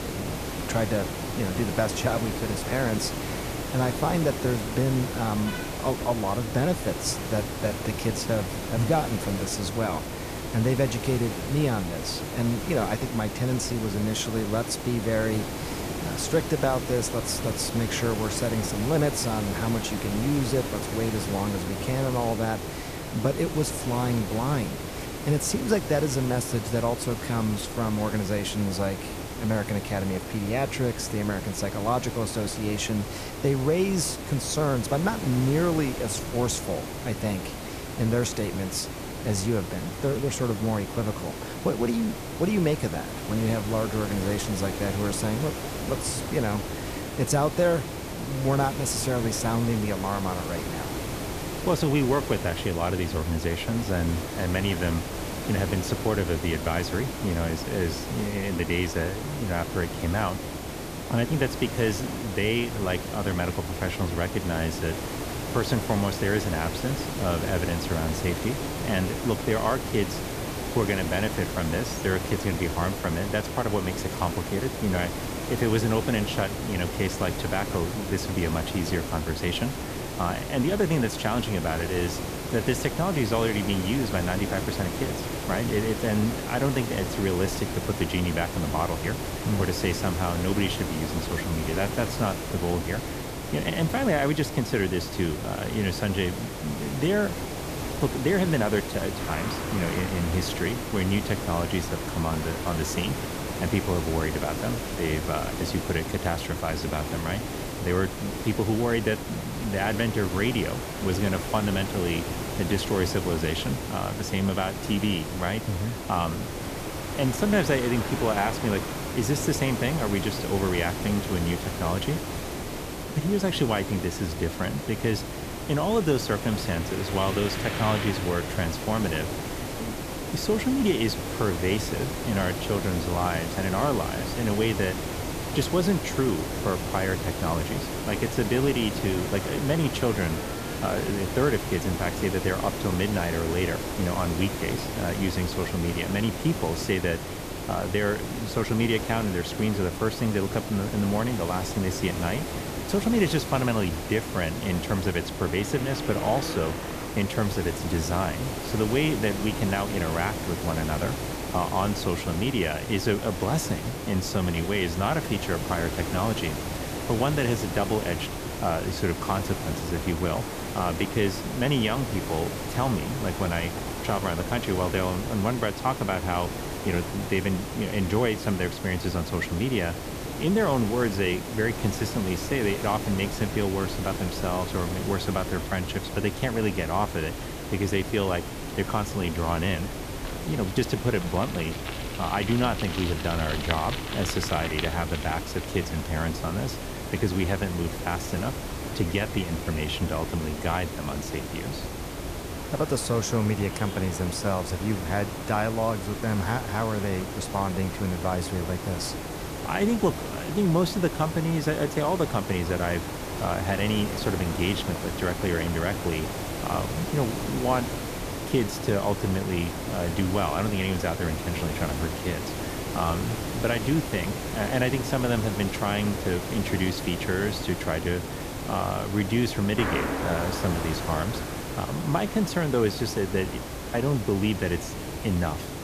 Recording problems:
hiss; loud; throughout; 5 dB below the speech
traffic noise; noticeable; throughout; 15 dB below the speech

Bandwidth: 14.5 kHz